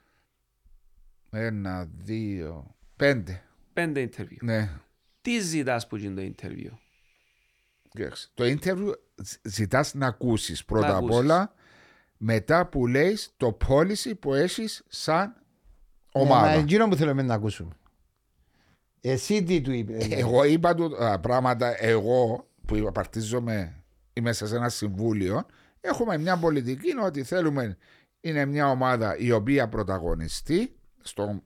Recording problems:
none

